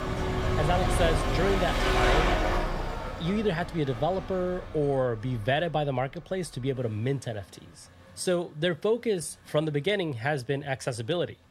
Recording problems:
traffic noise; very loud; throughout; as loud as the speech

